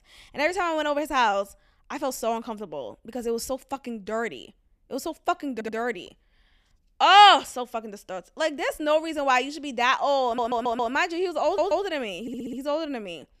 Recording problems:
audio stuttering; 4 times, first at 5.5 s

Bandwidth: 14.5 kHz